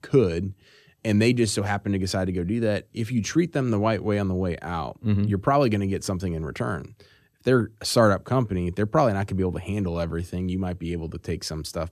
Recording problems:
none

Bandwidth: 14.5 kHz